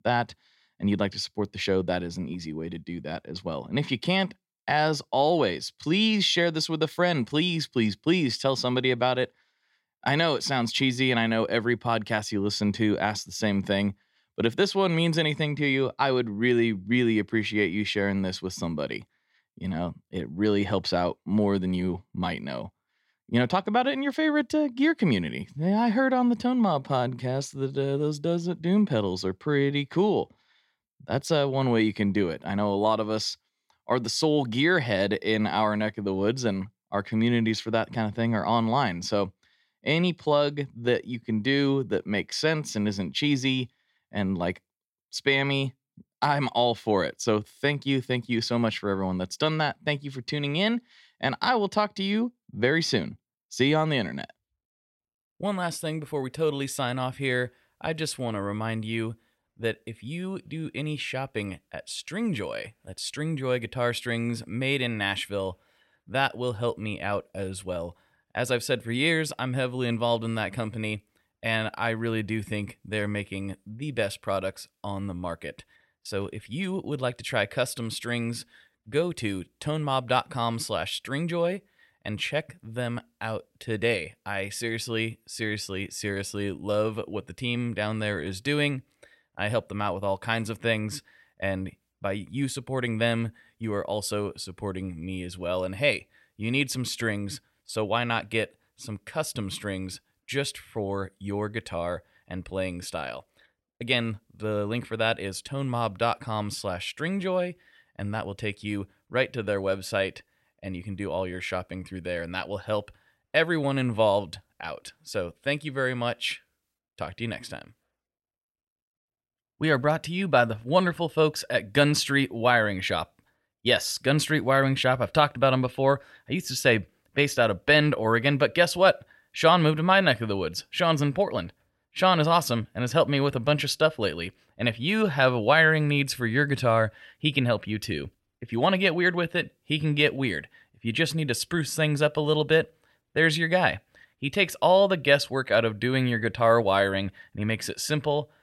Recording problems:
none

